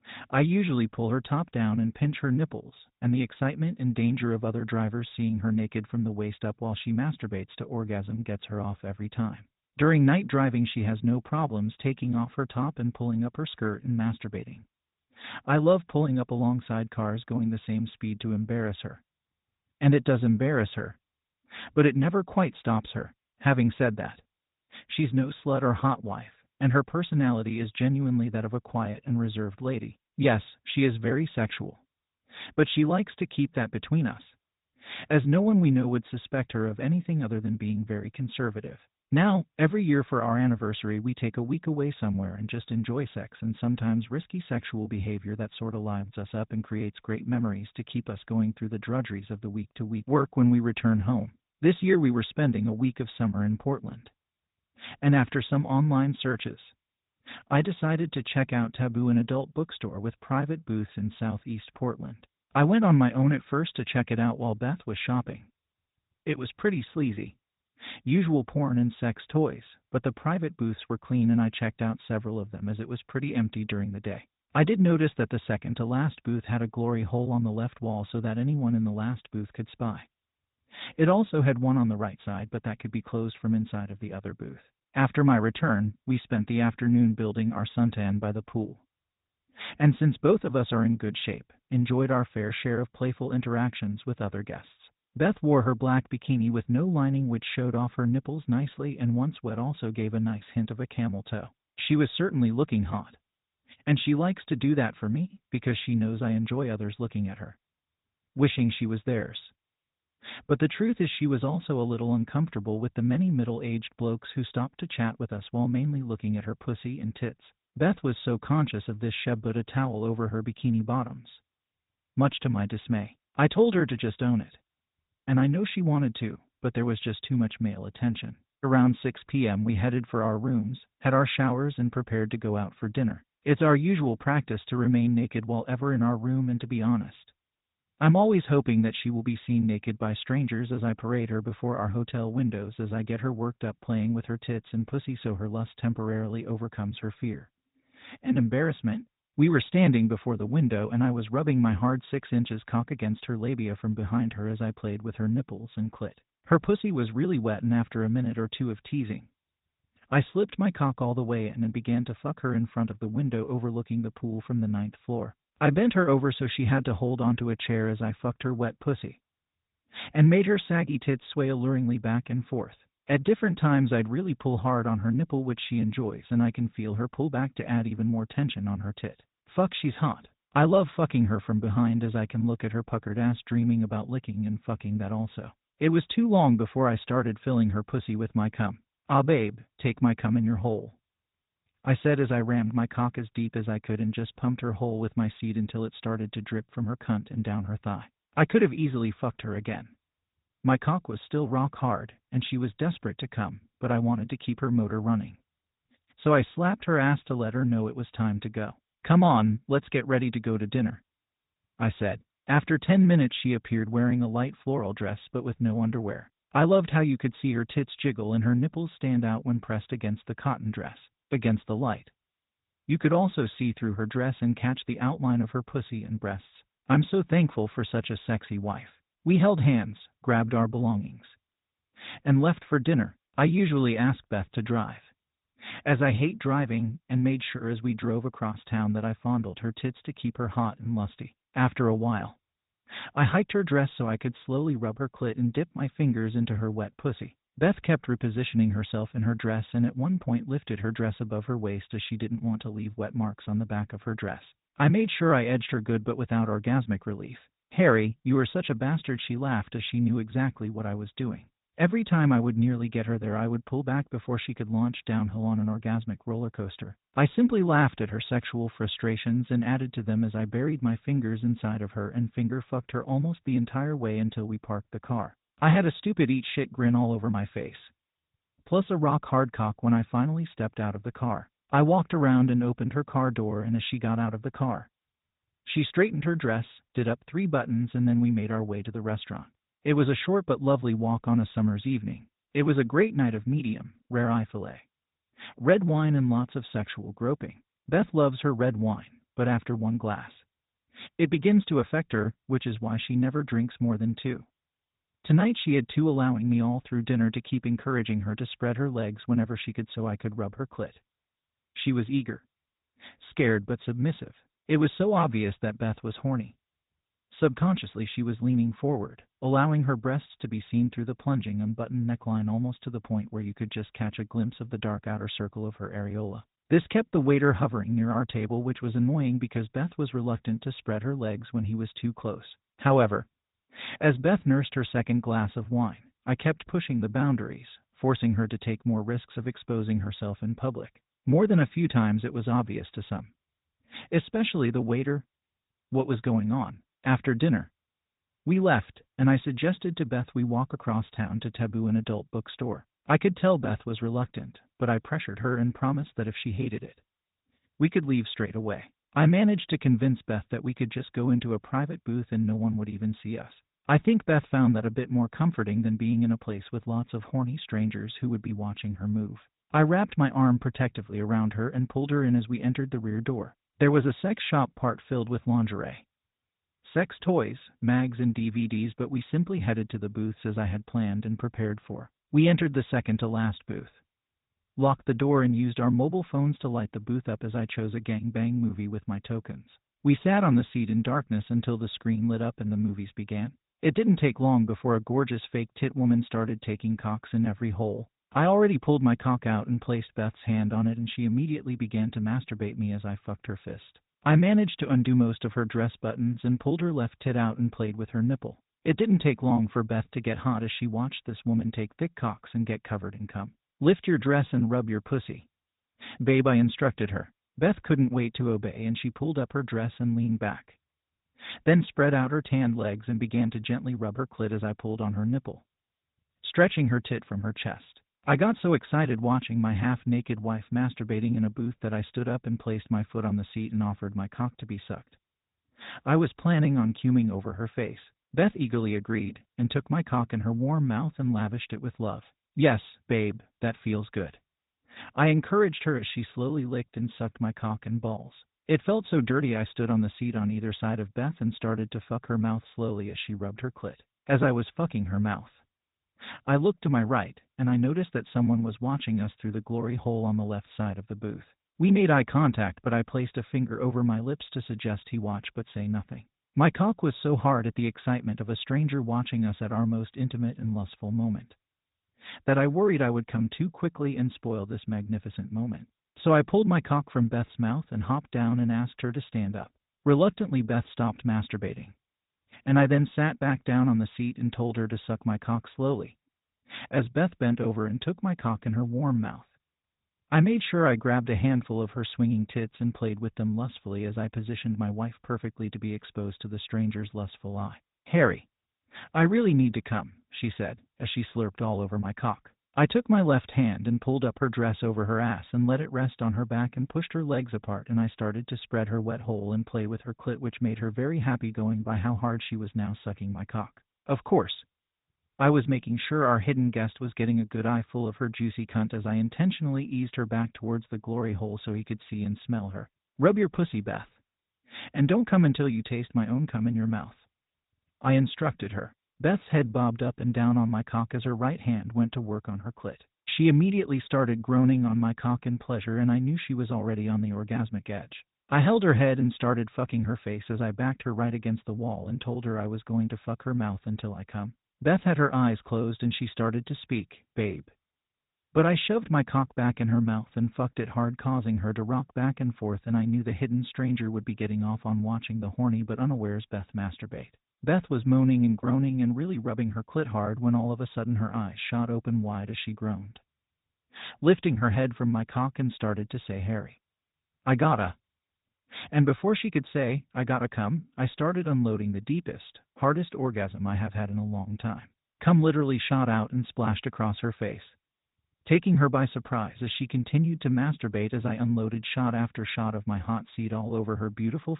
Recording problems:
high frequencies cut off; severe; nothing above 4 kHz
garbled, watery; slightly

